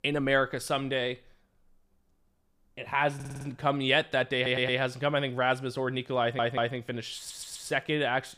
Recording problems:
audio stuttering; 4 times, first at 3 s

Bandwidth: 15 kHz